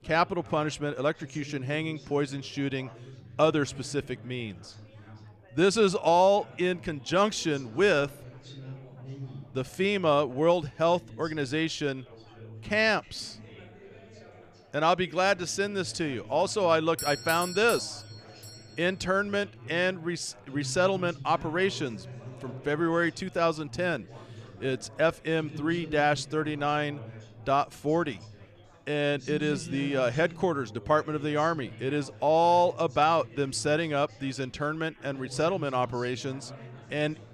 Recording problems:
chatter from many people; noticeable; throughout; 20 dB below the speech
doorbell; noticeable; from 17 to 19 s; peak 6 dB below the speech

